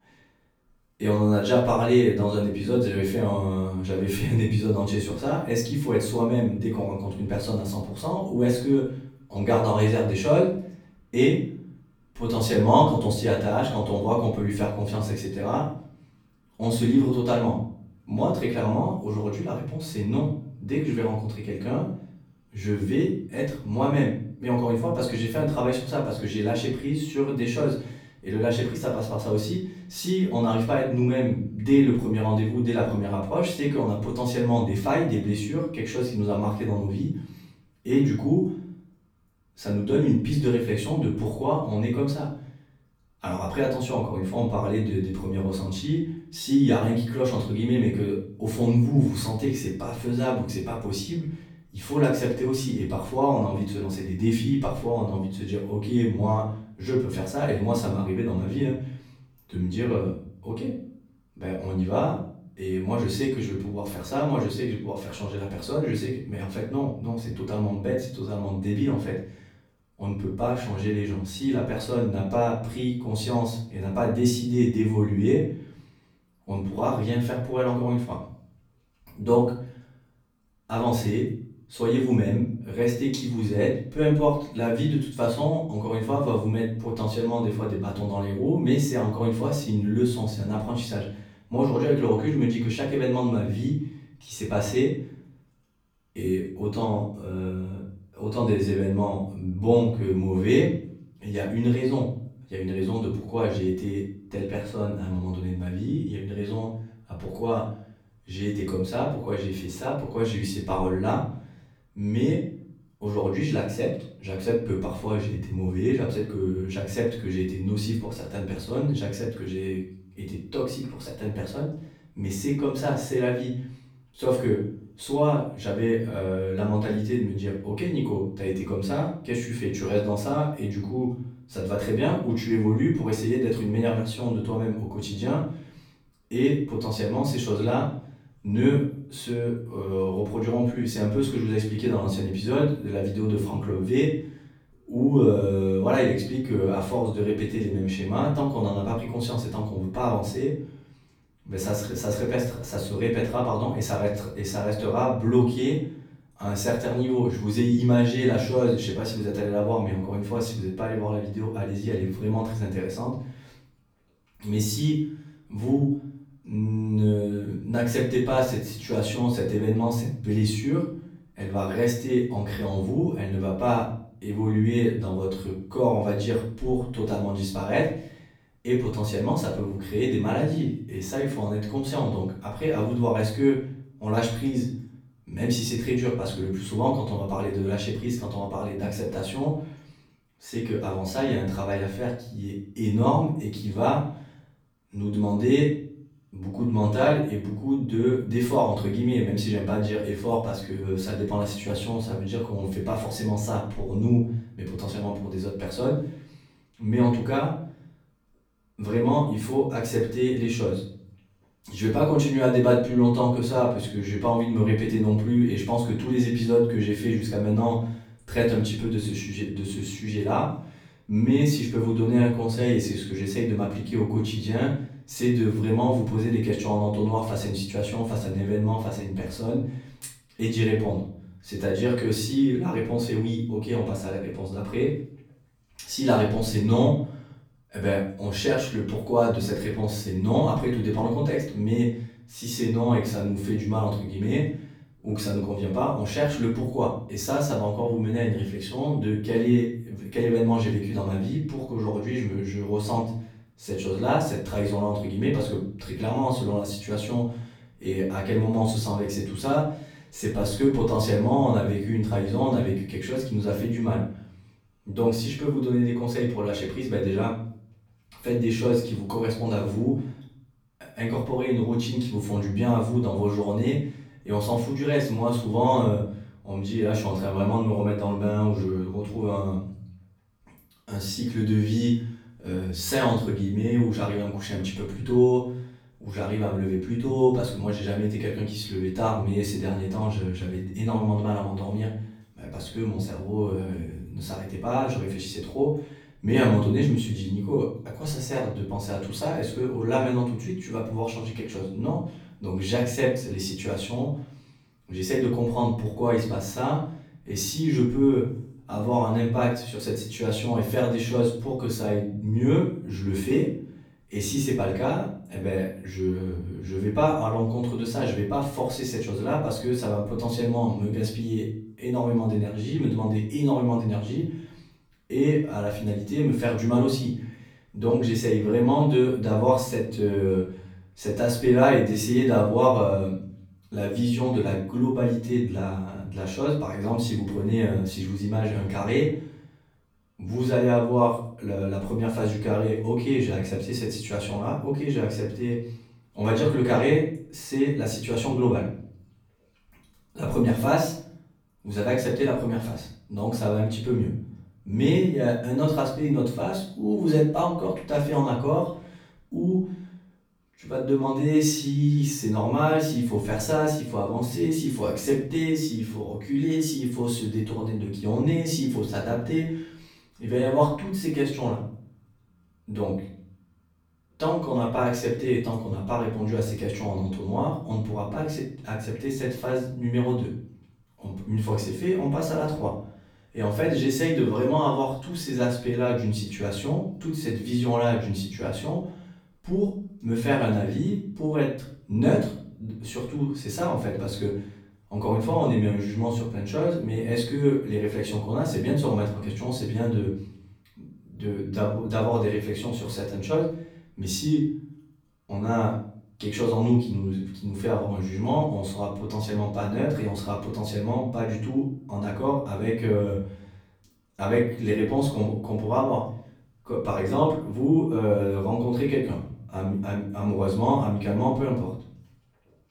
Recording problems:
off-mic speech; far
room echo; noticeable; dies away in 0.5 s

